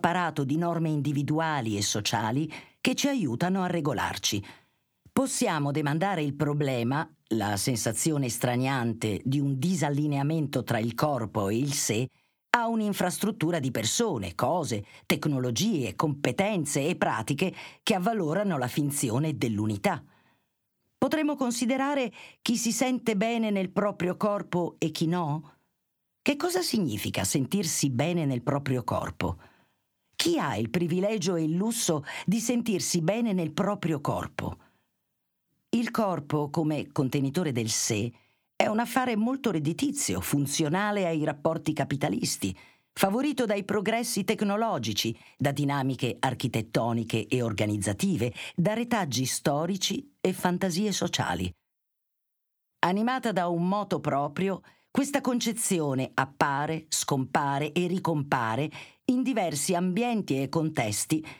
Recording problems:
squashed, flat; somewhat

